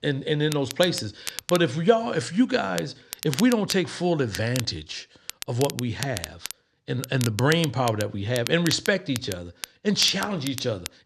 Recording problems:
crackle, like an old record; noticeable; 10 dB below the speech

